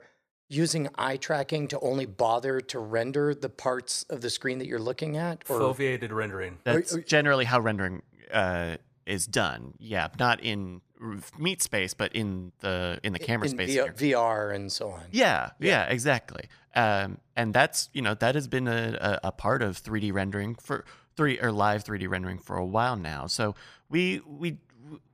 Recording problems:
none

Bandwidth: 15 kHz